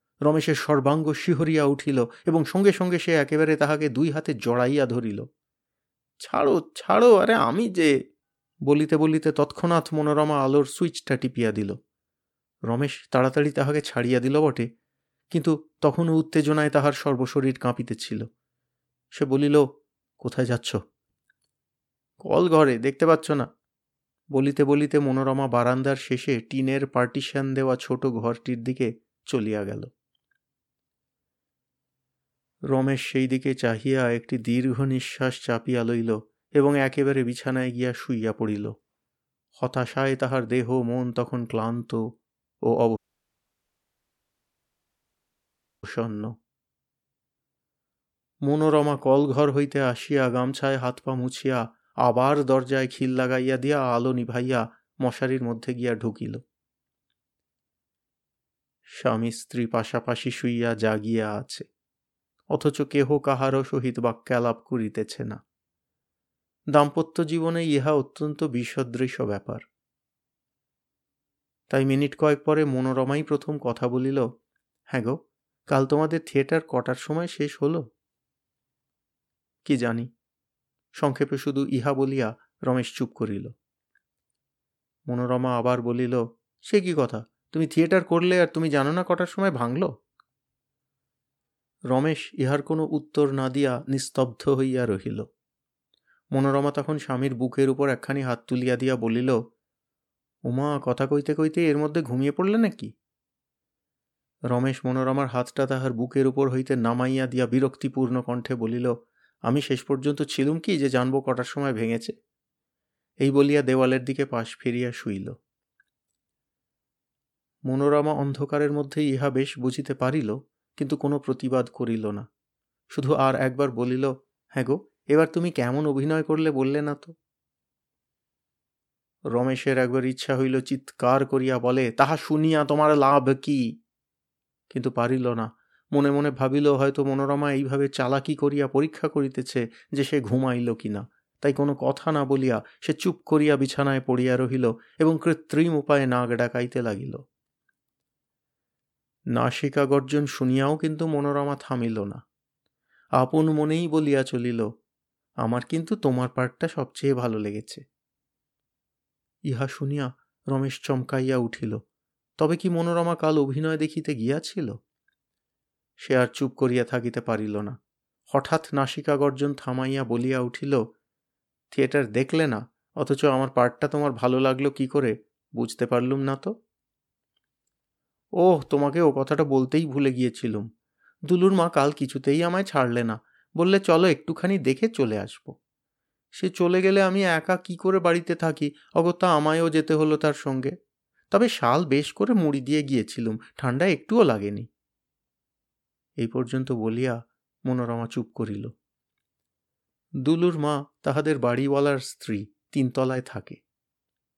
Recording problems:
audio cutting out; at 43 s for 3 s

